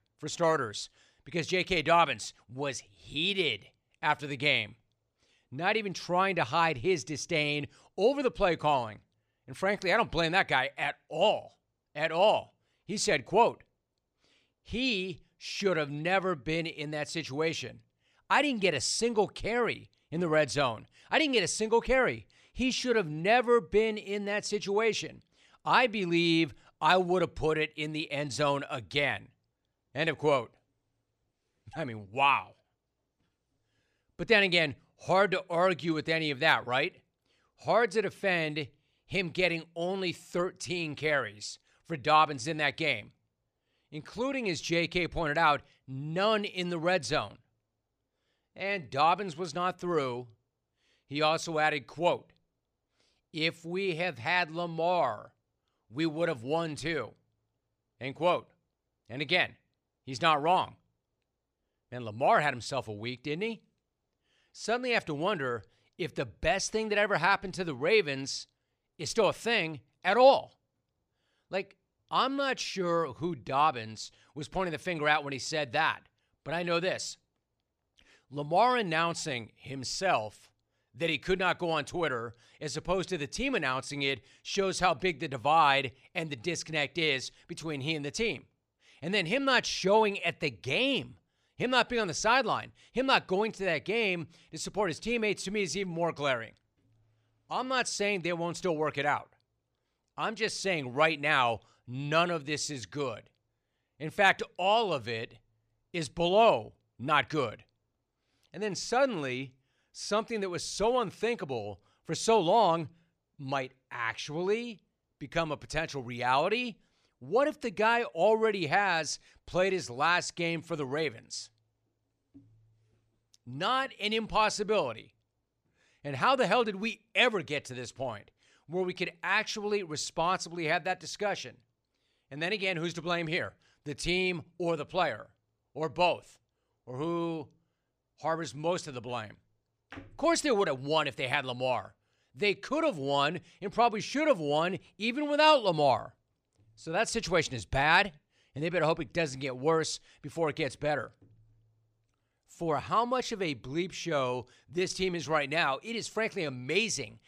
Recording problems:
none

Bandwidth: 14.5 kHz